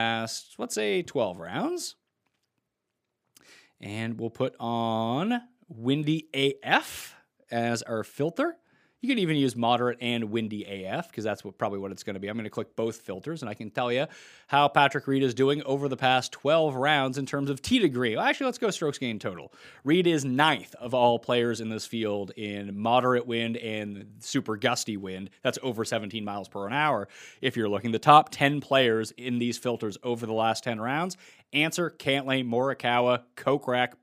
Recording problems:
abrupt cut into speech; at the start

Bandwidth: 15 kHz